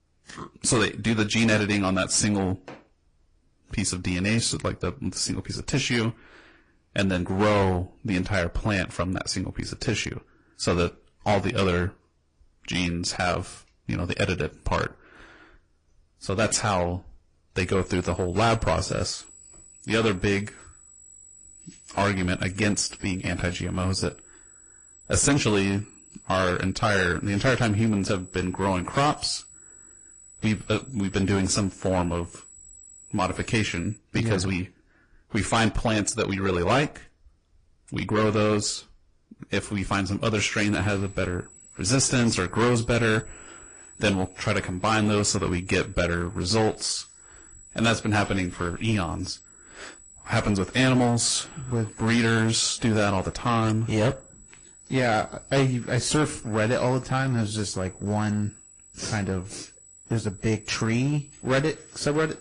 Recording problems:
distortion; heavy; 7% of the sound clipped
garbled, watery; slightly; nothing above 9 kHz
high-pitched whine; faint; from 18 to 34 s and from 41 s on; 8 kHz, 20 dB below the speech

